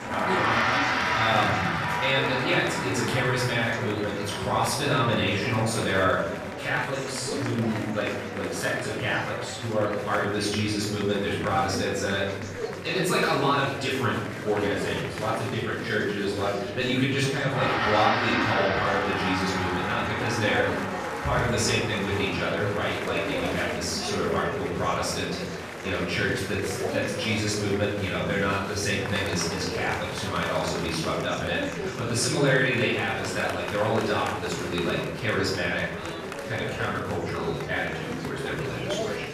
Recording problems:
off-mic speech; far
room echo; noticeable; dies away in 0.8 s
background music; loud; throughout; 3 dB below the speech
murmuring crowd; loud; throughout; 7 dB below the speech

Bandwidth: 14 kHz